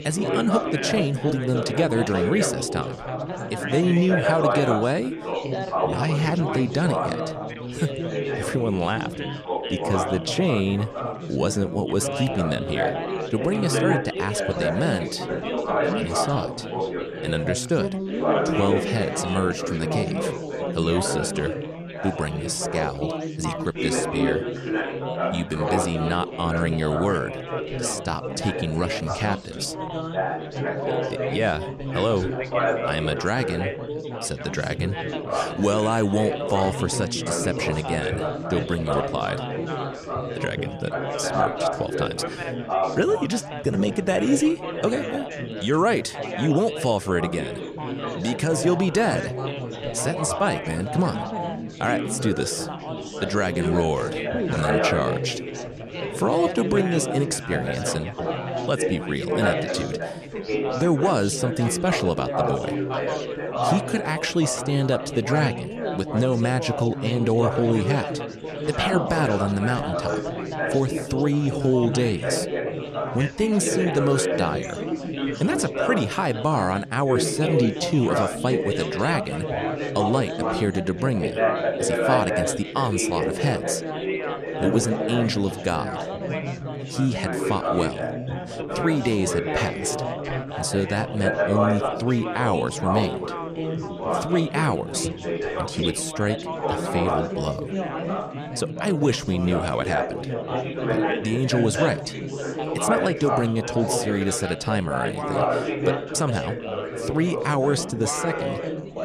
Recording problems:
chatter from many people; loud; throughout; 2 dB below the speech

